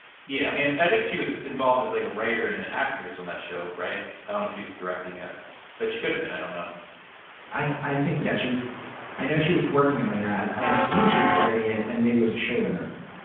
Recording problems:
off-mic speech; far
room echo; noticeable; dies away in 0.7 s
phone-call audio; nothing above 3.5 kHz
train or aircraft noise; loud; throughout; 2 dB below the speech
hiss; faint; throughout; 20 dB below the speech

